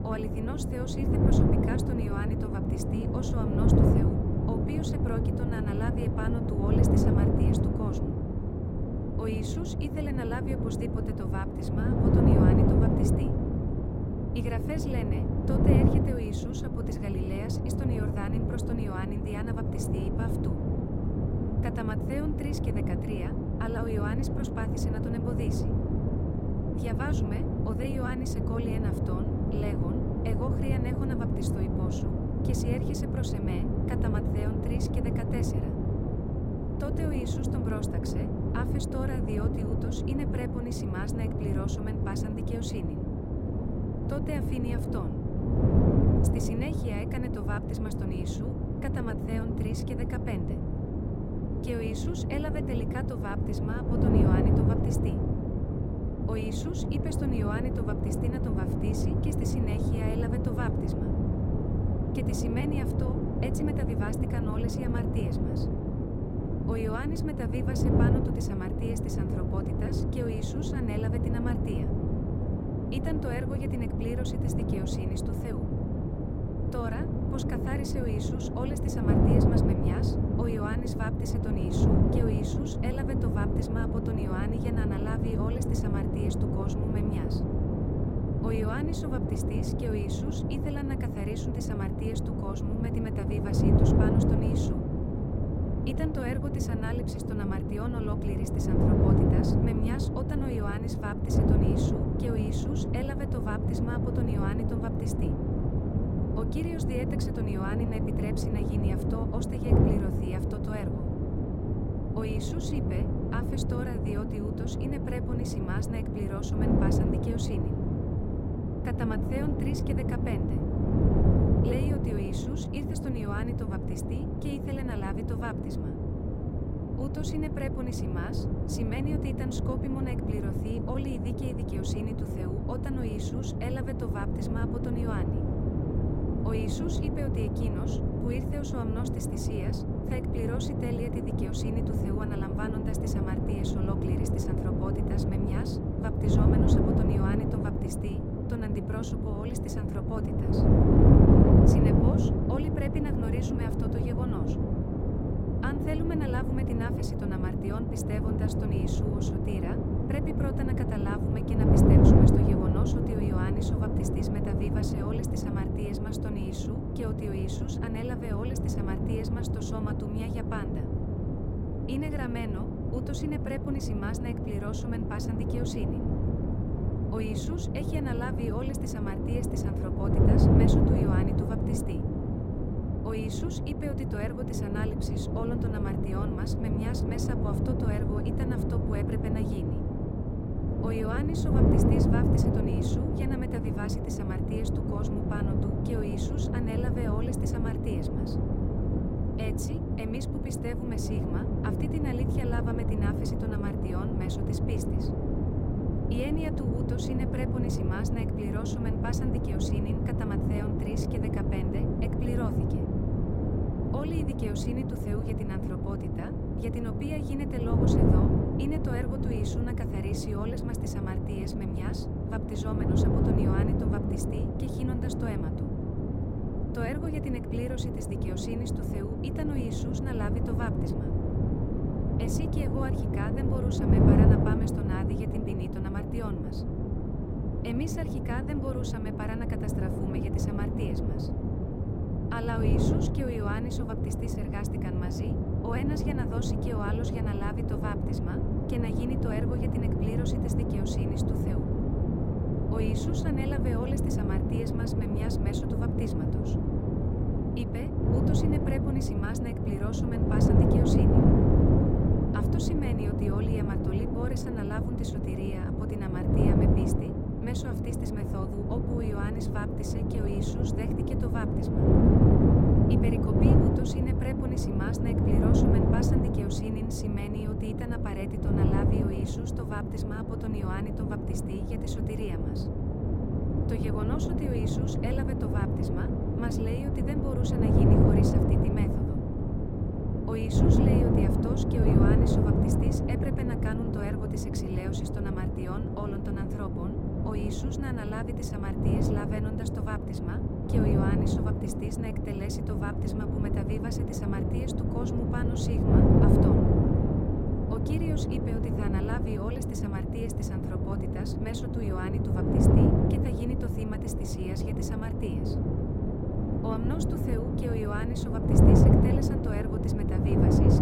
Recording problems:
wind noise on the microphone; heavy; 4 dB above the speech

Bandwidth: 16 kHz